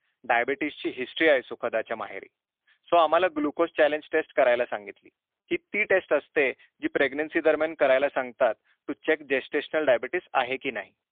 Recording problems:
phone-call audio; poor line

